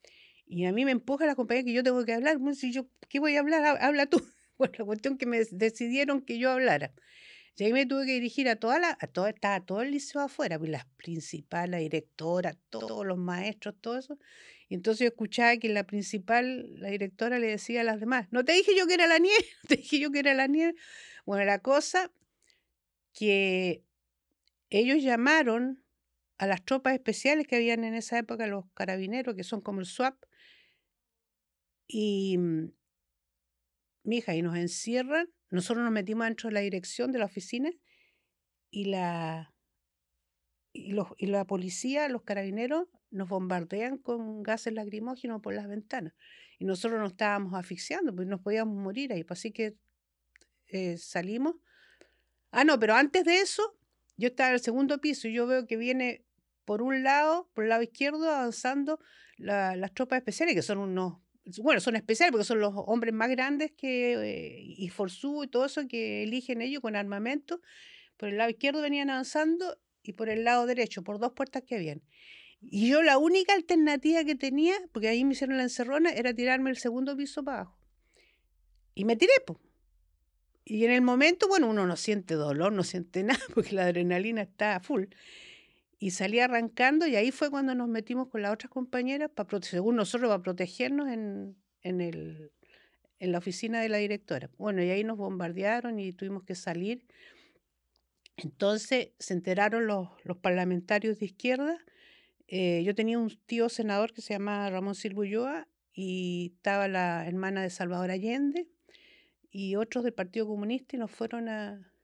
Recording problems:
audio stuttering; at 13 s

